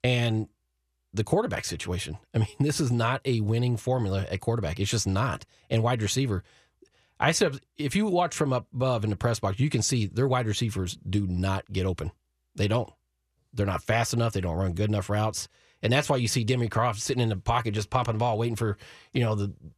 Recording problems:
none

